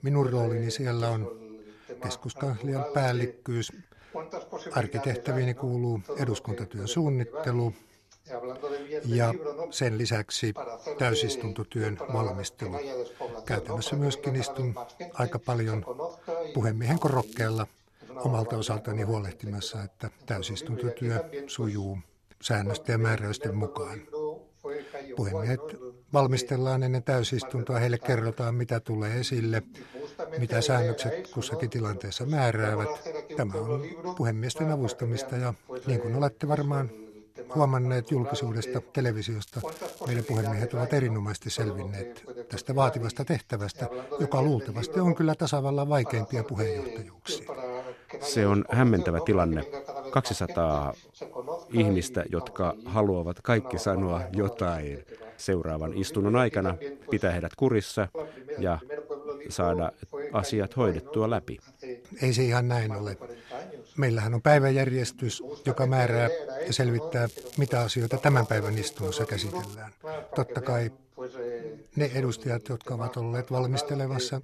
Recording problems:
voice in the background; loud; throughout; 9 dB below the speech
crackling; noticeable; at 17 s, from 39 to 40 s and from 1:07 to 1:10; 20 dB below the speech

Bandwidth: 13.5 kHz